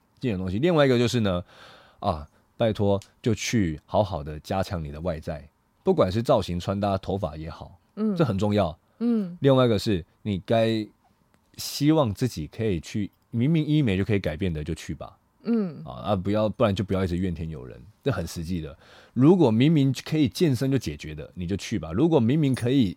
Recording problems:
none

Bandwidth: 16 kHz